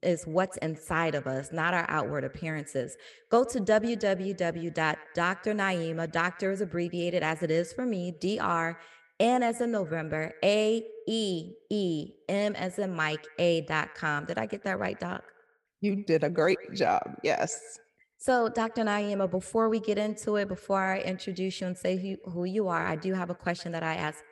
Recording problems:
echo of what is said; faint; throughout; 120 ms later, 20 dB below the speech

